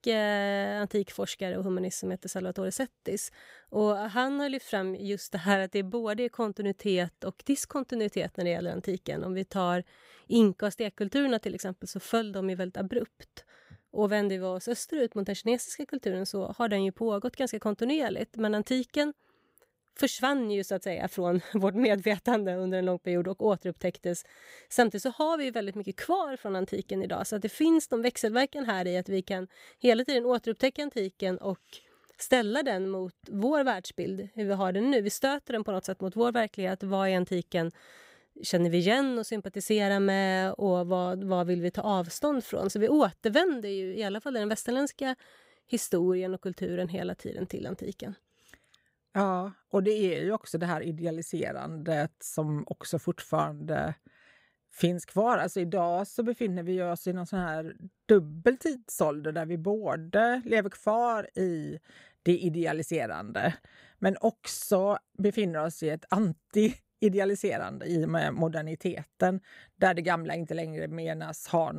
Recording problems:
abrupt cut into speech; at the end

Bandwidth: 15.5 kHz